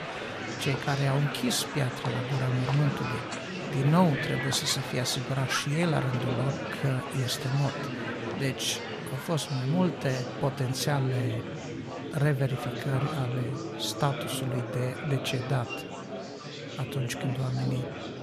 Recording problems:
murmuring crowd; loud; throughout; 5 dB below the speech

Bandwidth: 14 kHz